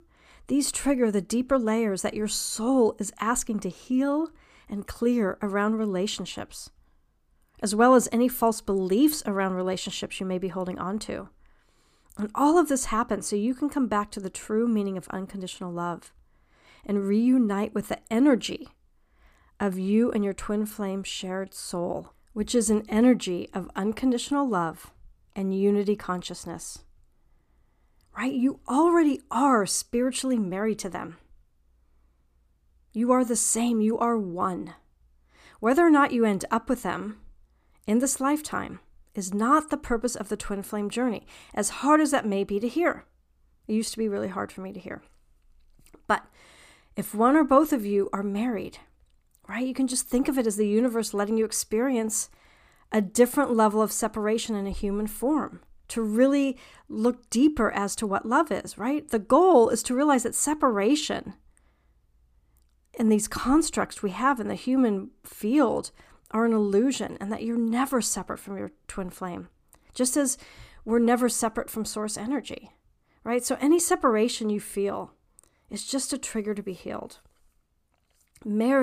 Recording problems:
abrupt cut into speech; at the end

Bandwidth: 15 kHz